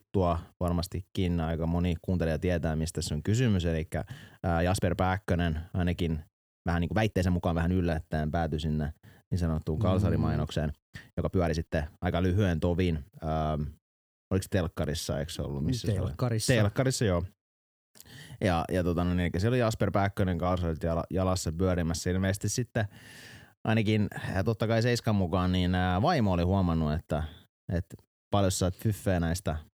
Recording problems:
uneven, jittery; strongly; from 1 to 23 s

